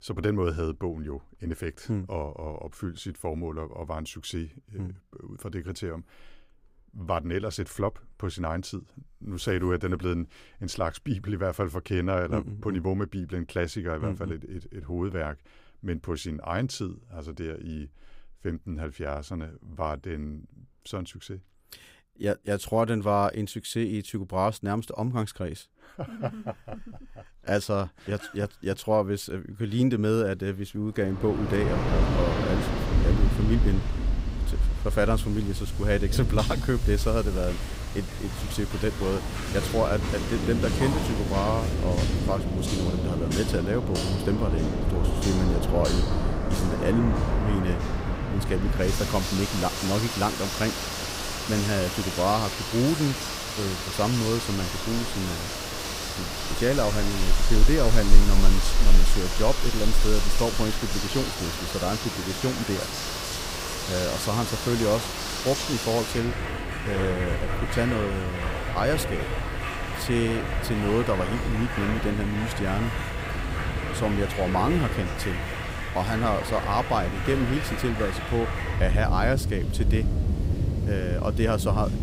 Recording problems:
rain or running water; very loud; from 31 s on; as loud as the speech

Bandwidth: 15.5 kHz